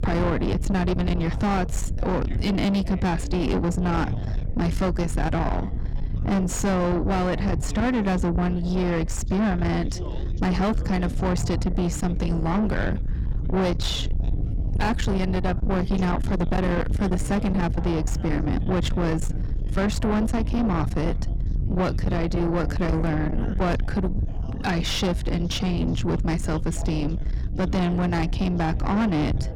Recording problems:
distortion; heavy; 7 dB below the speech
low rumble; loud; throughout; 9 dB below the speech
rain or running water; noticeable; throughout; 20 dB below the speech
background chatter; noticeable; throughout; 3 voices, 20 dB below the speech

